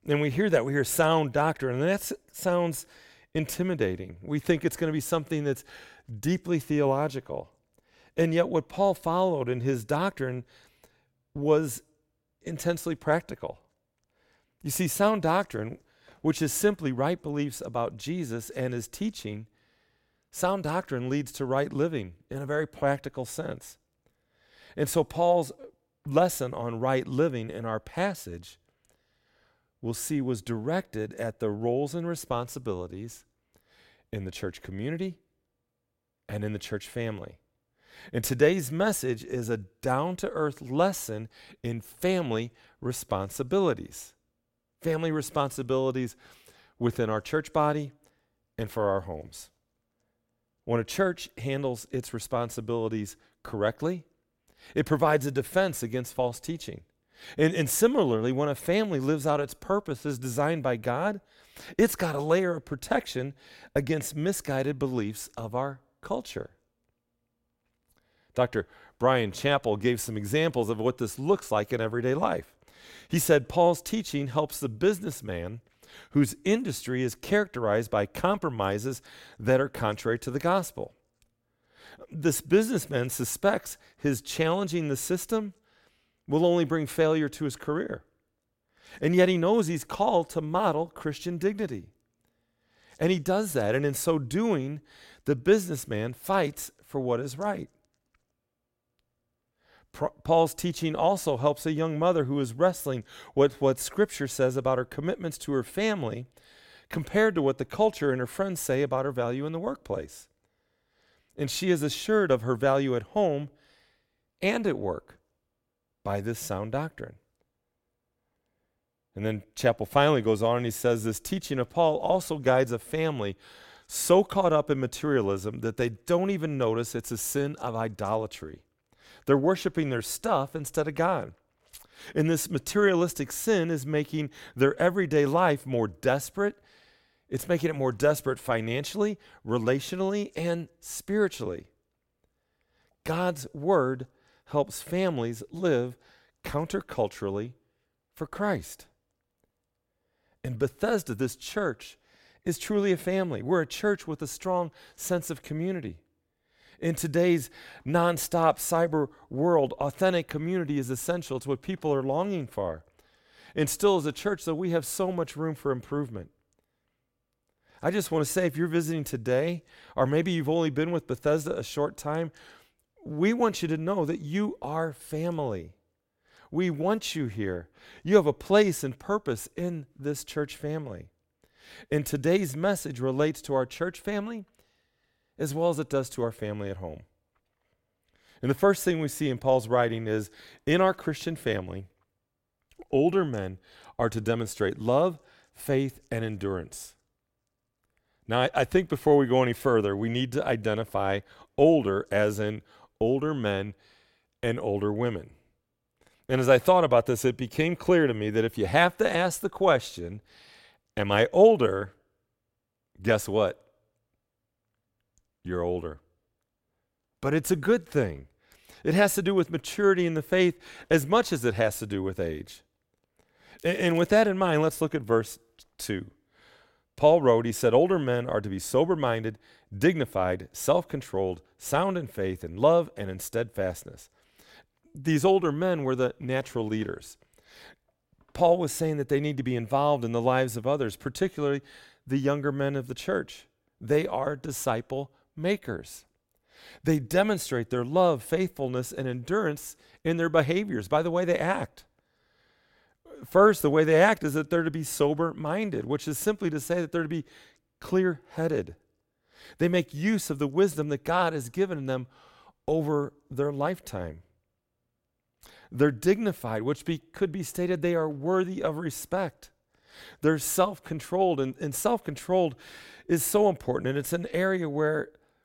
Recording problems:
crackling; faint; at 3:44; 30 dB below the speech

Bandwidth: 16.5 kHz